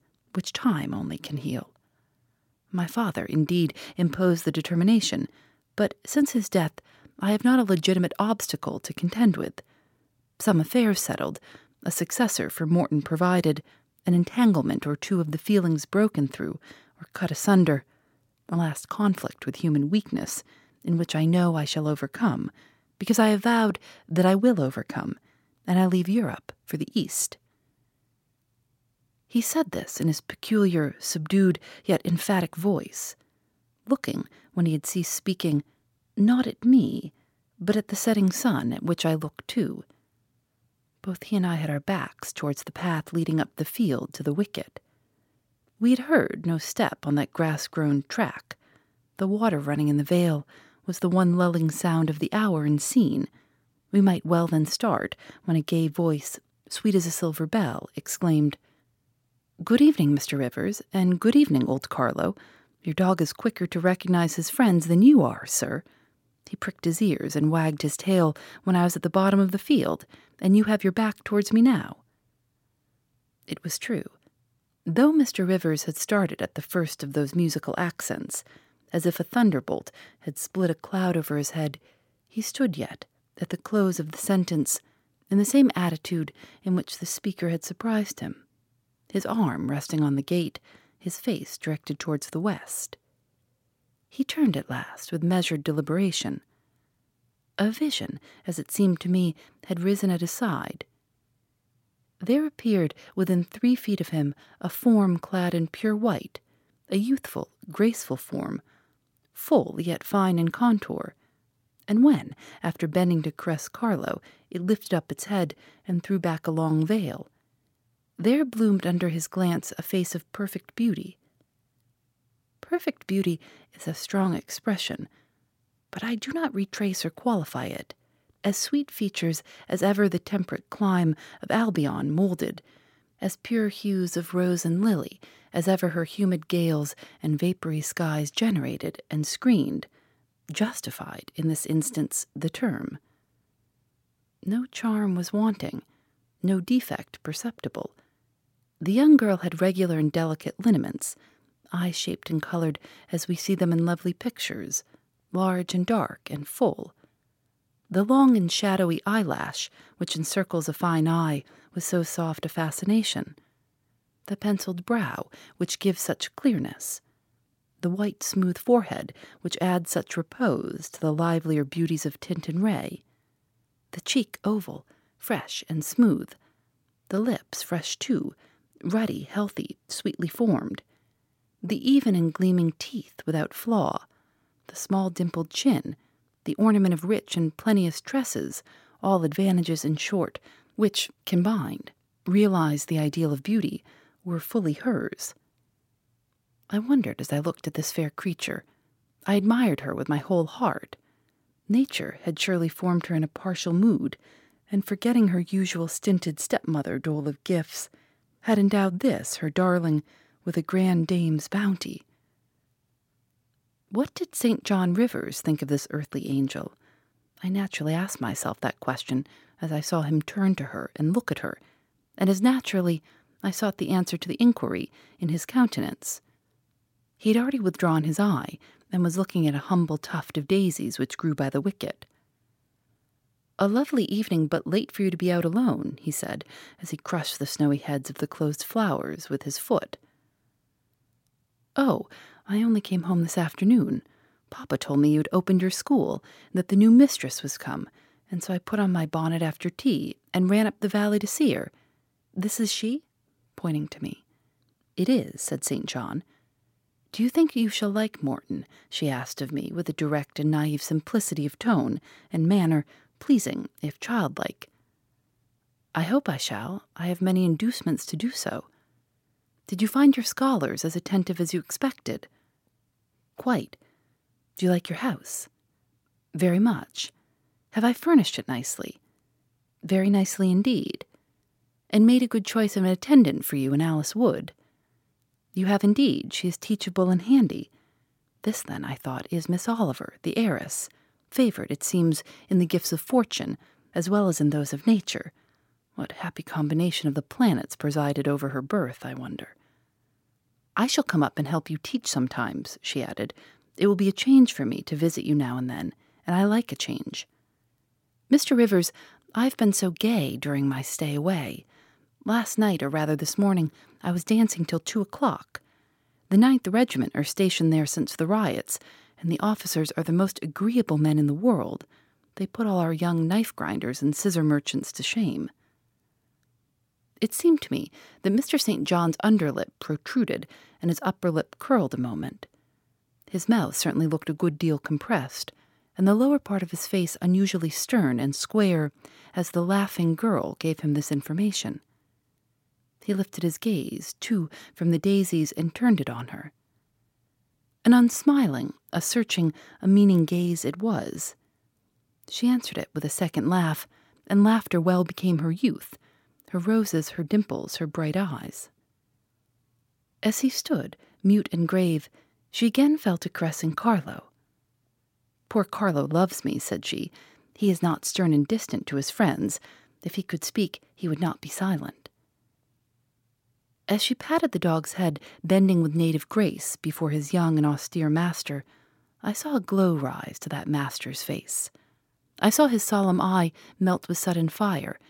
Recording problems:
none

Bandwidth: 16.5 kHz